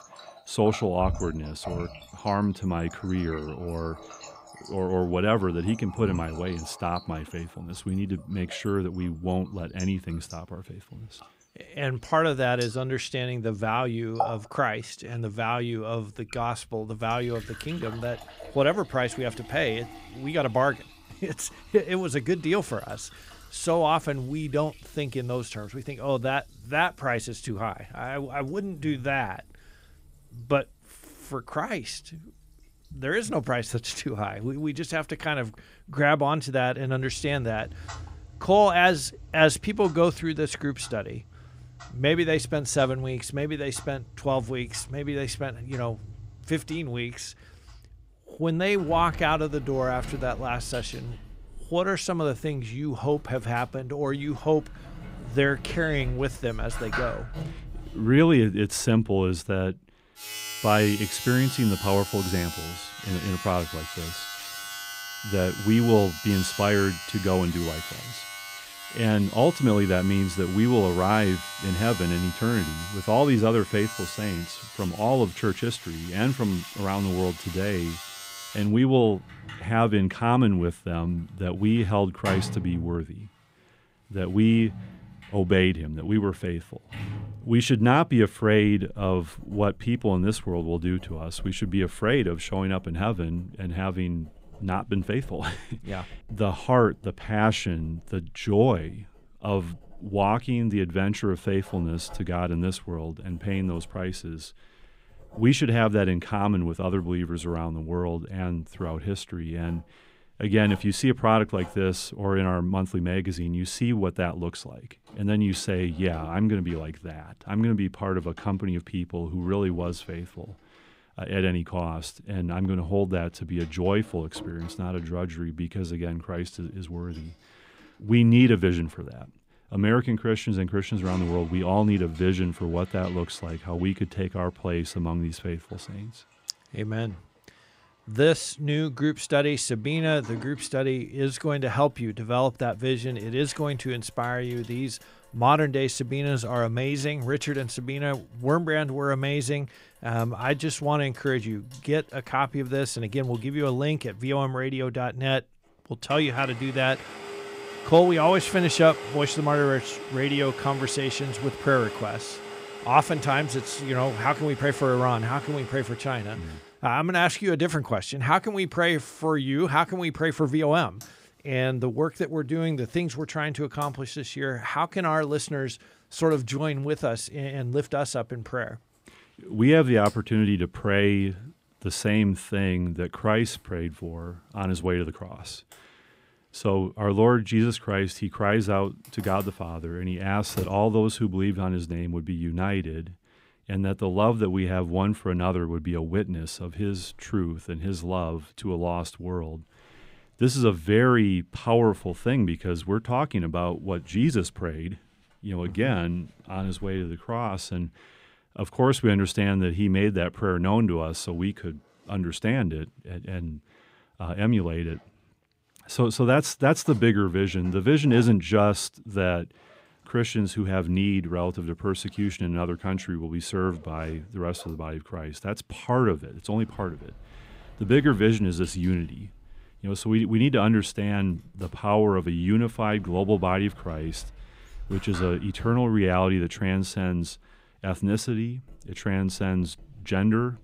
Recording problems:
household noises; noticeable; throughout; 15 dB below the speech

